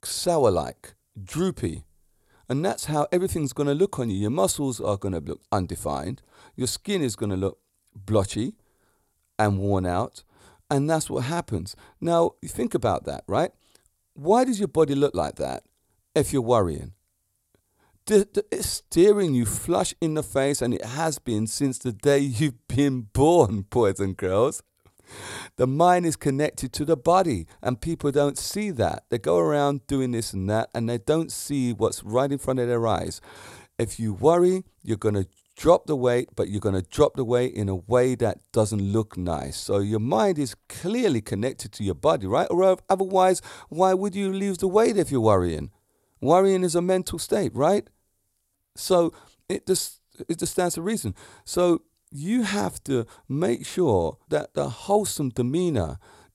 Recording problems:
none

